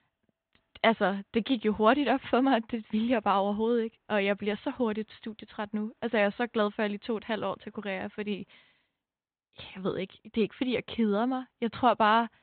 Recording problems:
high frequencies cut off; severe; nothing above 4 kHz

